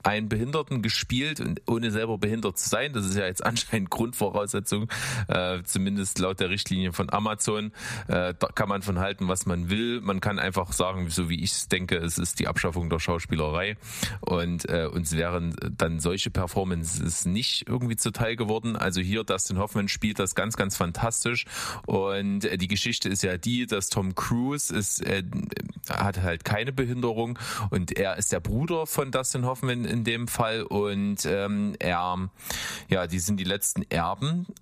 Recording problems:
squashed, flat; somewhat

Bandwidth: 14.5 kHz